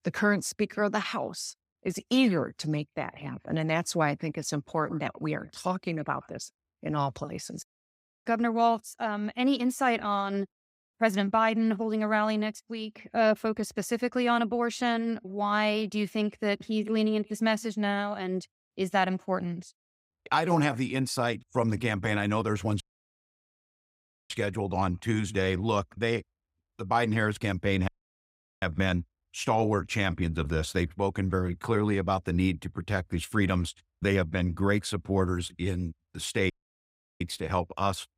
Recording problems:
audio cutting out; at 23 s for 1.5 s, at 28 s for 0.5 s and at 37 s for 0.5 s

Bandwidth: 15.5 kHz